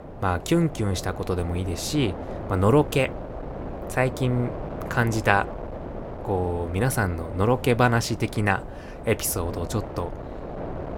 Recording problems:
wind noise on the microphone; occasional gusts; 10 dB below the speech

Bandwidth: 16.5 kHz